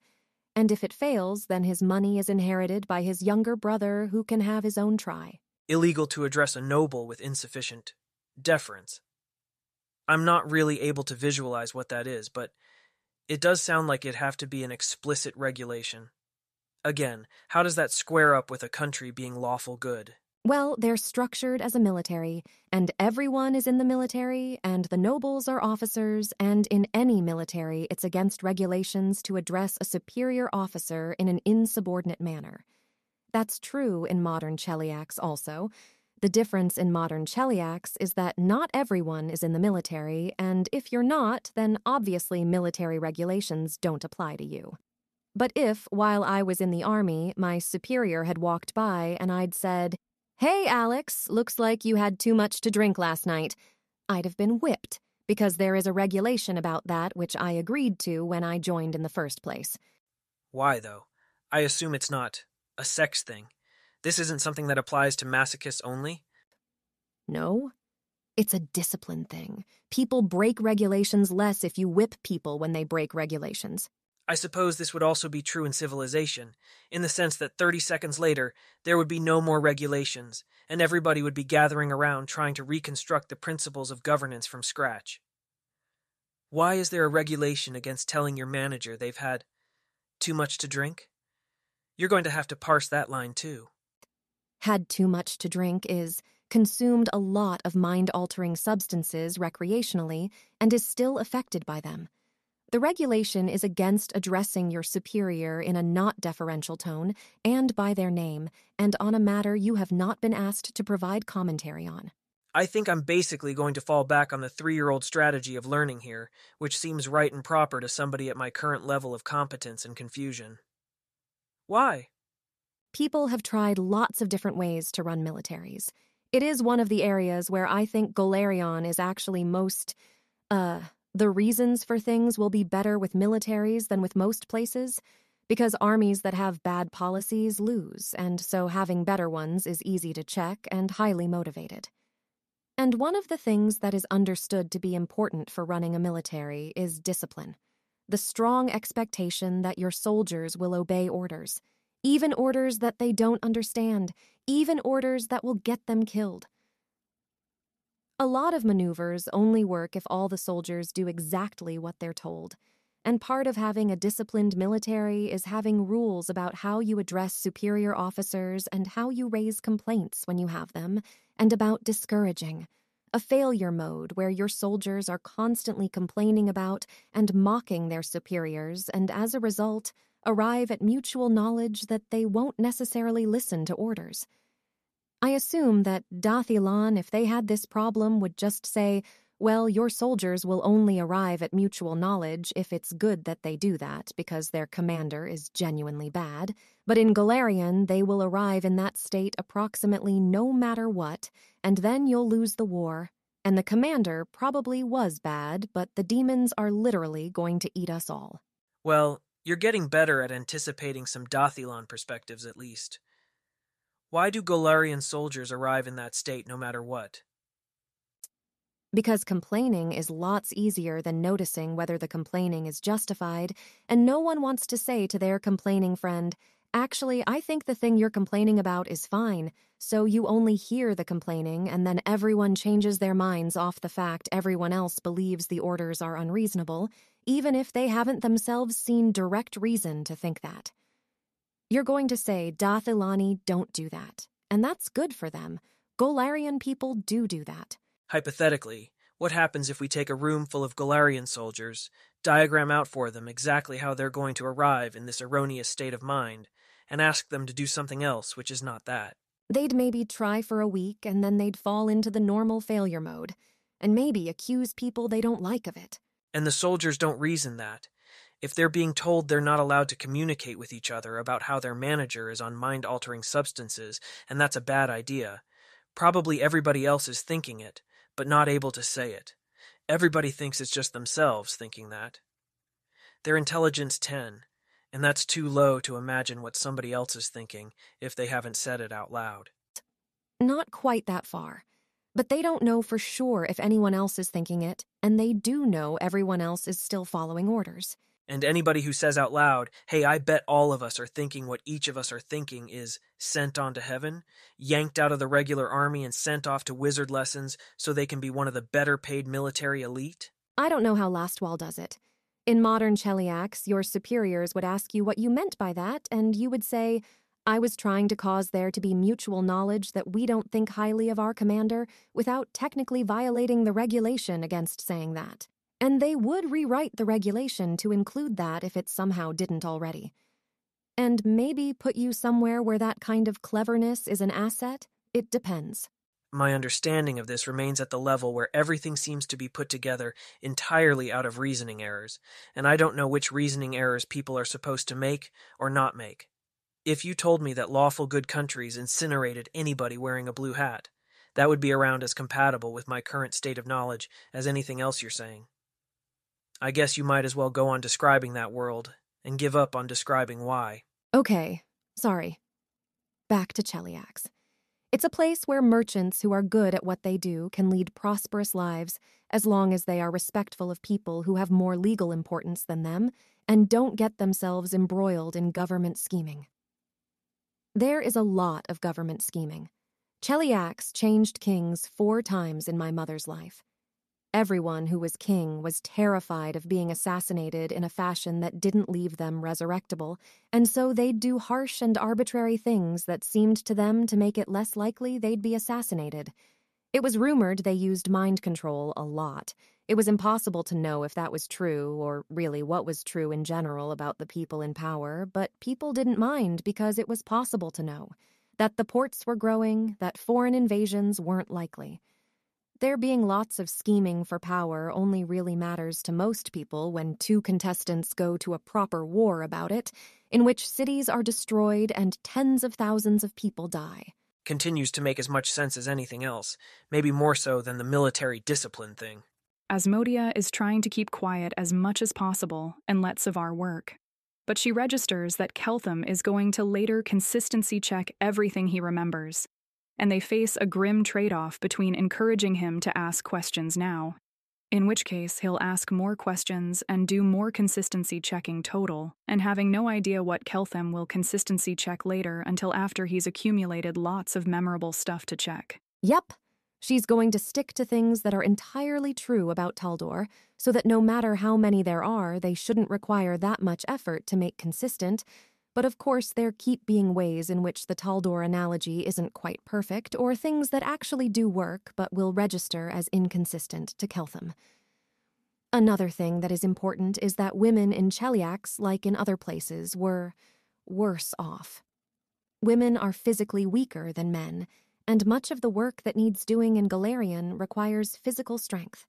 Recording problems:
none

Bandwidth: 13.5 kHz